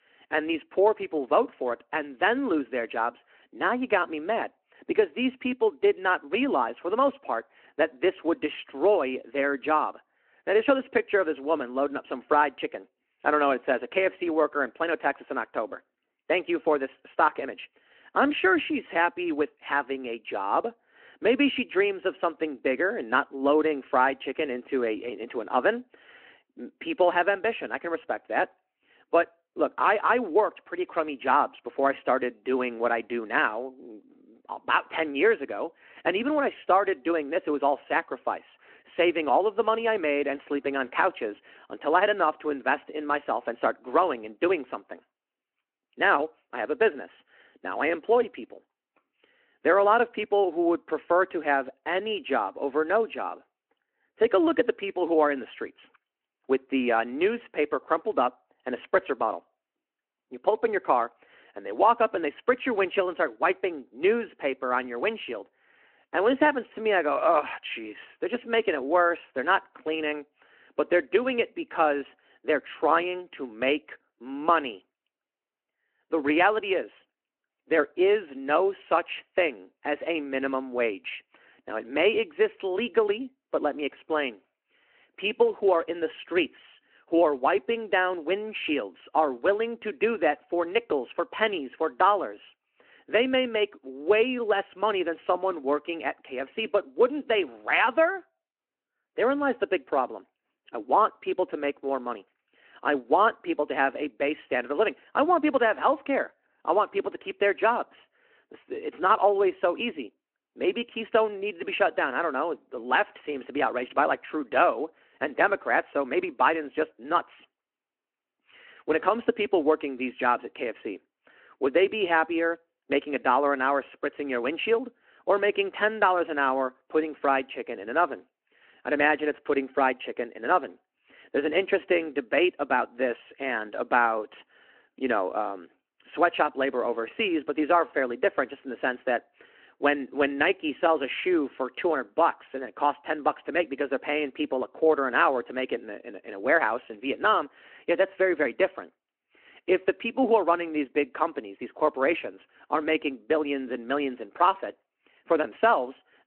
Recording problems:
phone-call audio

